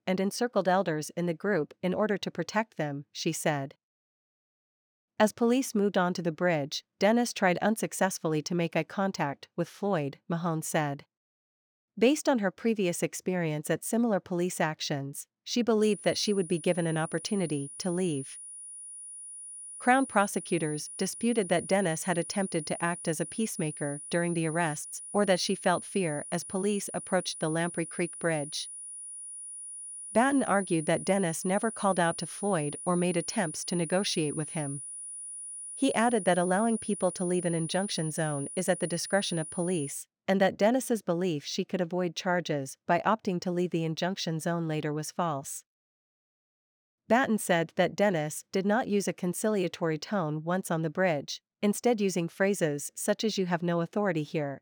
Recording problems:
high-pitched whine; loud; from 16 to 40 s; 9.5 kHz, 10 dB below the speech

